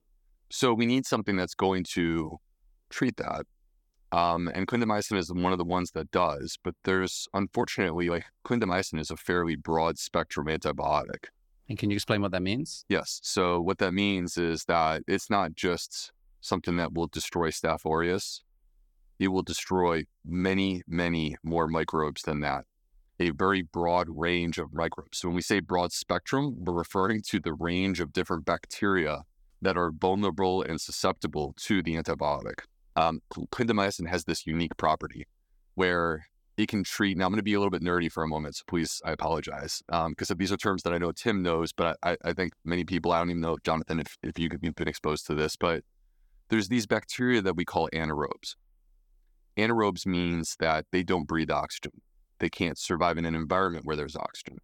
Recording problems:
none

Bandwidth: 18 kHz